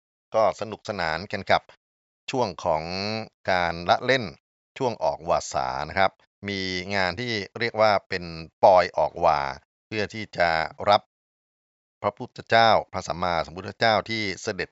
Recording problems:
high frequencies cut off; noticeable; nothing above 8 kHz

